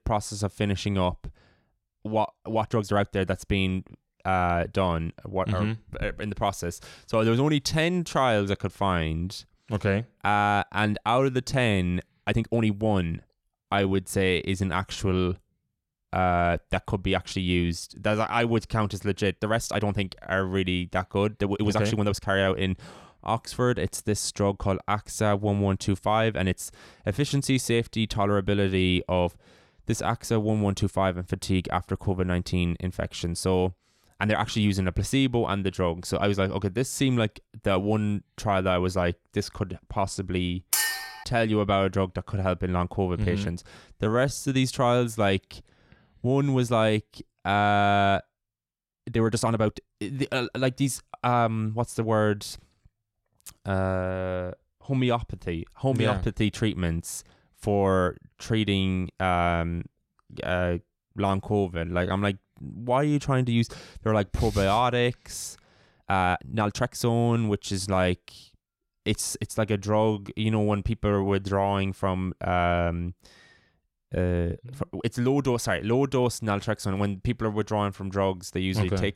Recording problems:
uneven, jittery; strongly; from 2.5 s to 1:15
clattering dishes; loud; at 41 s; peak 3 dB above the speech

